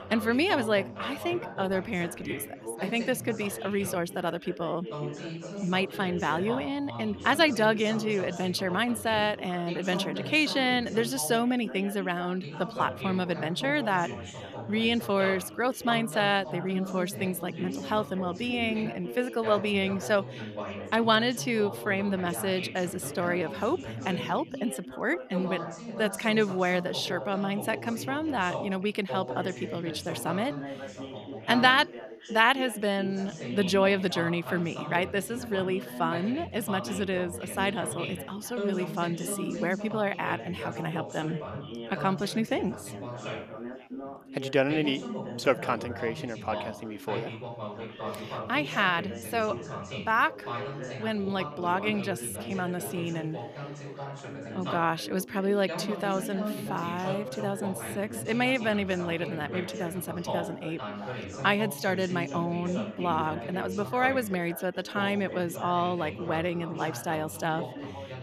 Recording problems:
background chatter; loud; throughout; 3 voices, 9 dB below the speech

